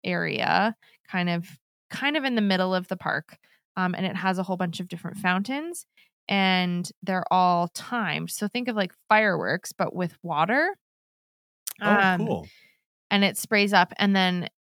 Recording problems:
none

